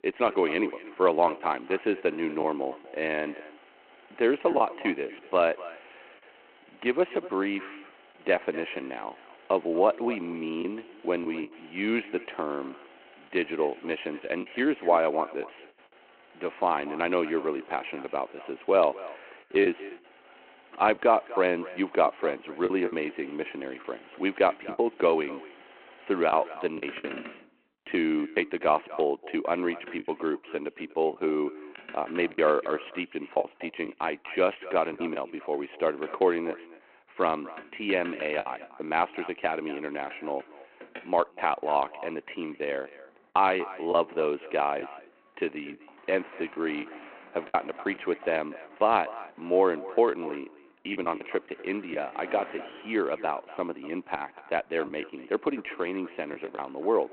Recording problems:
echo of what is said; noticeable; throughout; 240 ms later, 20 dB below the speech
phone-call audio
traffic noise; faint; throughout; 20 dB below the speech
choppy; occasionally; 4% of the speech affected

